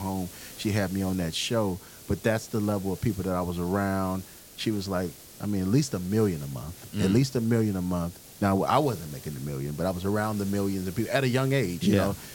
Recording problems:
hiss; noticeable; throughout; 15 dB below the speech
abrupt cut into speech; at the start

